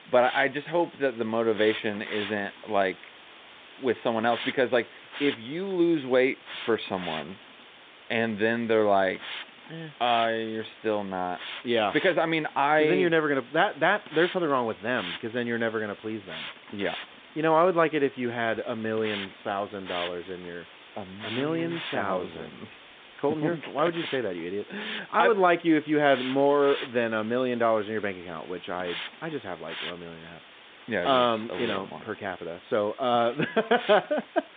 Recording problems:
phone-call audio; nothing above 3.5 kHz
hiss; noticeable; throughout; 15 dB below the speech

